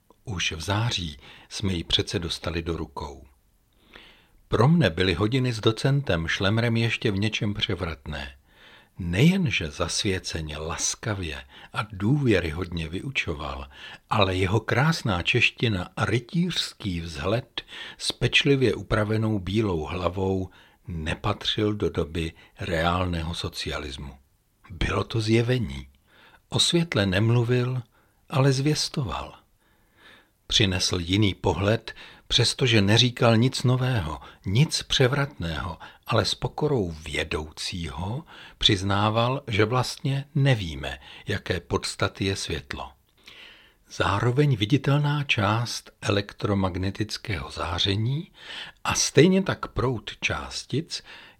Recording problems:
none

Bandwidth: 16.5 kHz